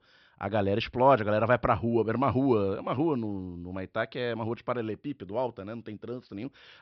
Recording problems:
high frequencies cut off; noticeable; nothing above 5.5 kHz

